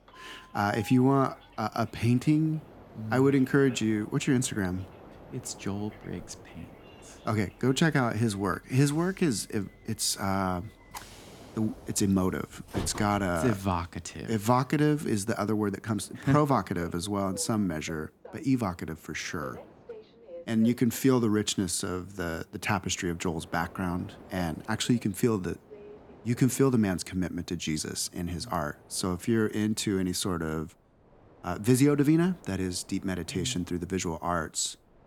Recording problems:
train or aircraft noise; faint; throughout; 20 dB below the speech

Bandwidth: 18.5 kHz